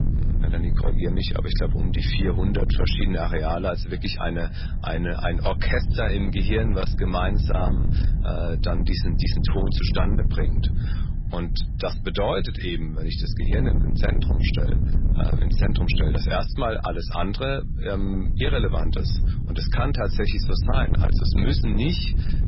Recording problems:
garbled, watery; badly; nothing above 5.5 kHz
distortion; slight; 15% of the sound clipped
low rumble; loud; throughout; 9 dB below the speech
traffic noise; noticeable; throughout; 15 dB below the speech

